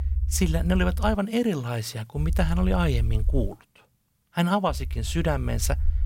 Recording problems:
low rumble; faint; until 1 s, from 2 to 3.5 s and from 4.5 s on; 20 dB below the speech

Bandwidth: 16 kHz